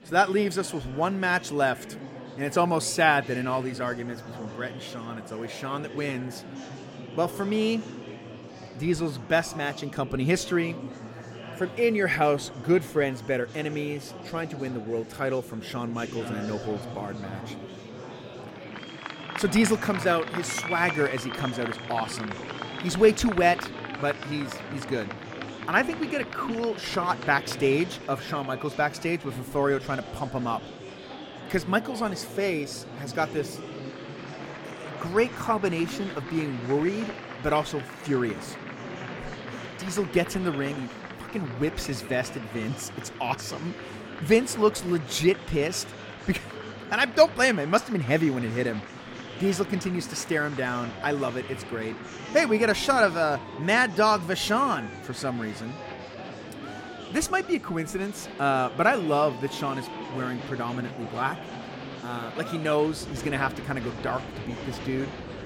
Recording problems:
murmuring crowd; noticeable; throughout; 10 dB below the speech

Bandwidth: 16.5 kHz